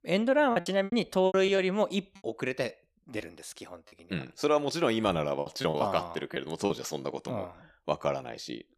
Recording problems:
choppy; very; from 0.5 to 2 s, at 3 s and from 5.5 to 6.5 s; 14% of the speech affected

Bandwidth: 14 kHz